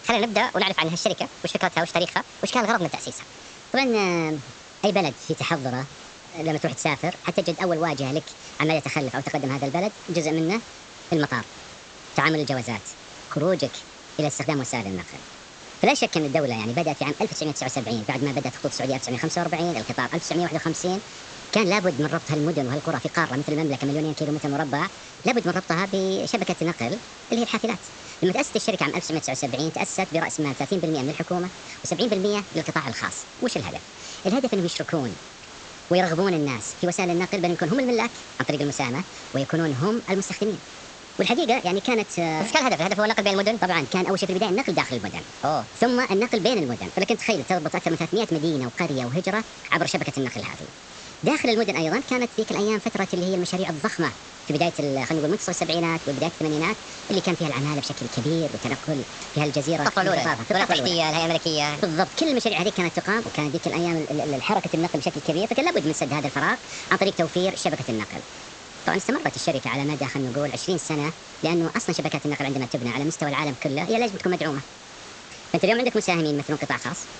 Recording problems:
wrong speed and pitch; too fast and too high; 1.5 times normal speed
high frequencies cut off; noticeable; nothing above 8 kHz
hiss; noticeable; throughout; 15 dB below the speech

